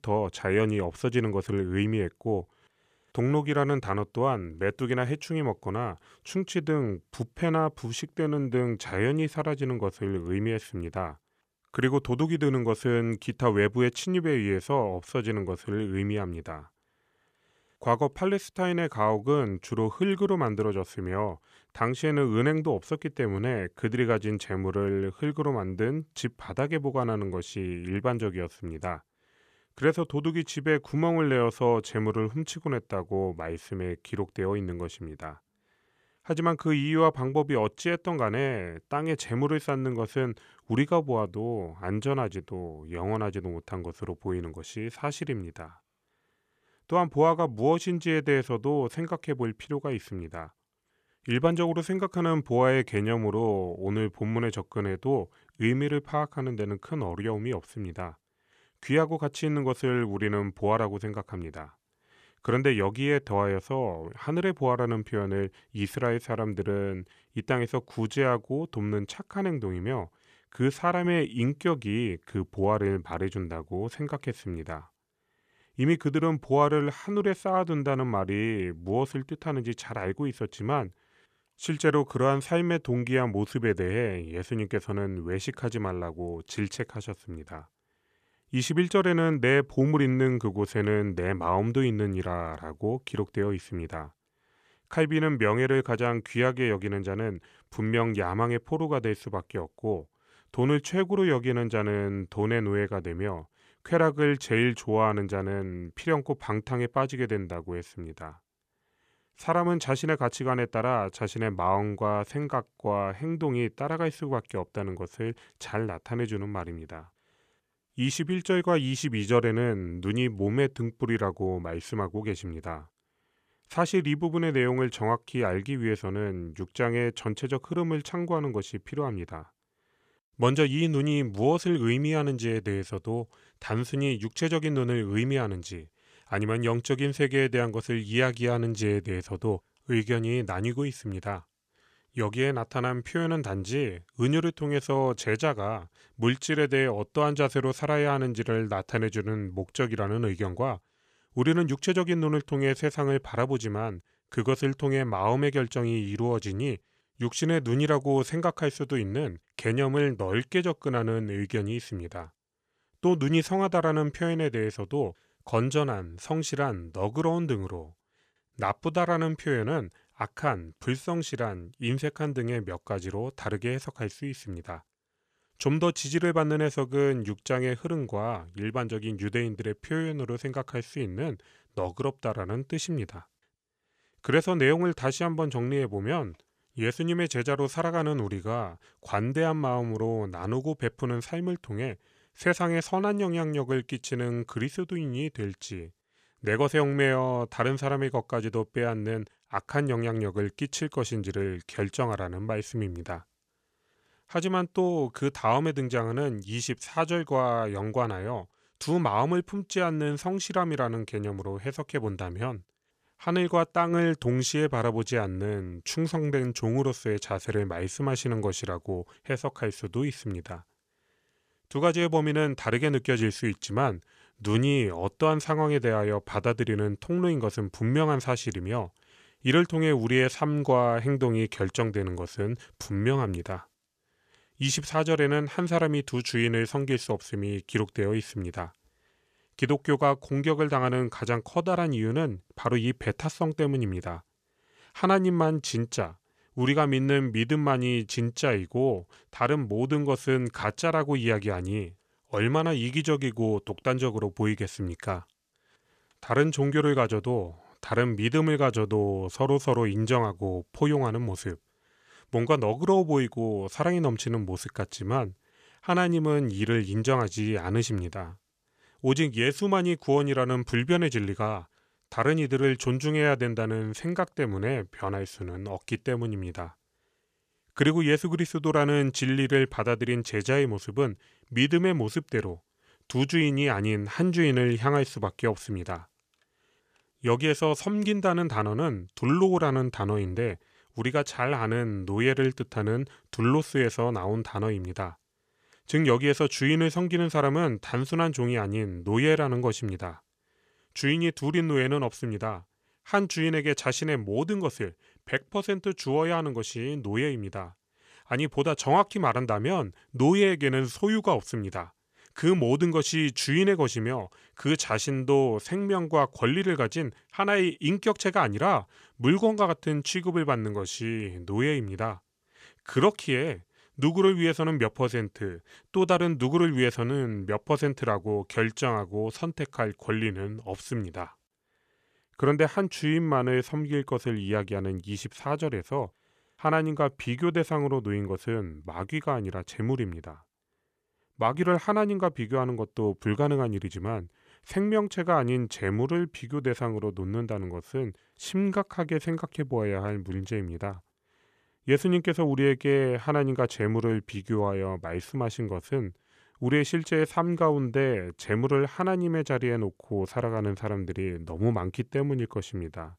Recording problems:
none

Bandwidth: 14.5 kHz